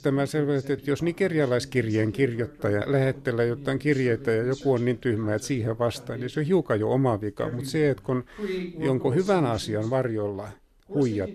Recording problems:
voice in the background; noticeable; throughout; 15 dB below the speech

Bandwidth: 13.5 kHz